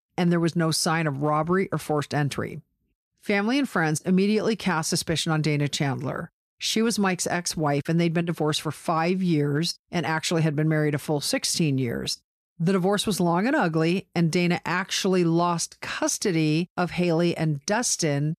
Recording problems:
none

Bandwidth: 14.5 kHz